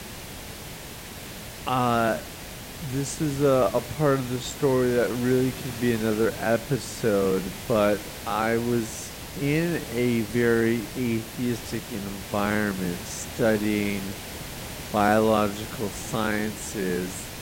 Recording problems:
wrong speed, natural pitch; too slow; 0.6 times normal speed
hiss; noticeable; throughout; 10 dB below the speech

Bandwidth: 16 kHz